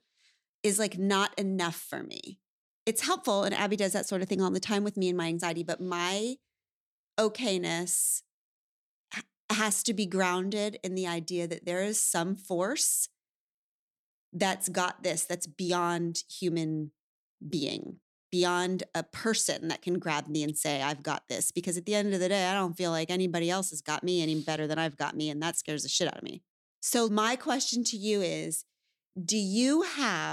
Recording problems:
abrupt cut into speech; at the end

